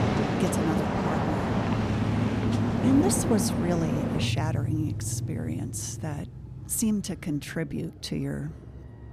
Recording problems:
traffic noise; very loud; throughout; 2 dB above the speech

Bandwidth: 14.5 kHz